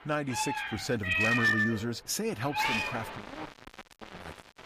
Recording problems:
distortion; heavy; 31% of the sound clipped
animal sounds; very loud; throughout; 3 dB above the speech

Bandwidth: 15 kHz